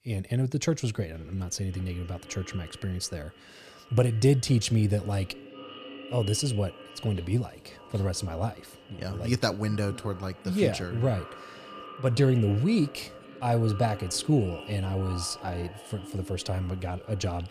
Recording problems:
echo of what is said; noticeable; throughout; 520 ms later, 15 dB below the speech

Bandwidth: 15 kHz